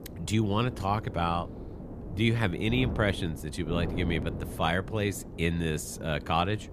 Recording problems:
wind noise on the microphone; occasional gusts; 15 dB below the speech

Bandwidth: 14.5 kHz